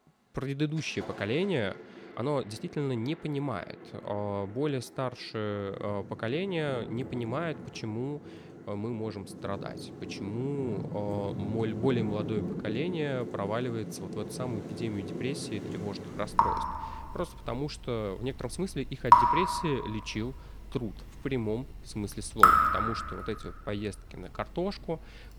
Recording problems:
rain or running water; very loud; throughout; 4 dB above the speech
uneven, jittery; strongly; from 2 to 24 s

